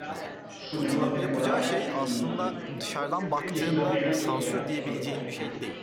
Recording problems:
chatter from many people; very loud; throughout; 3 dB above the speech

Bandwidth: 17.5 kHz